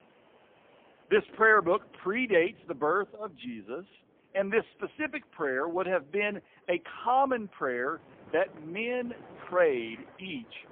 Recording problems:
phone-call audio; poor line
wind in the background; faint; throughout; 25 dB below the speech

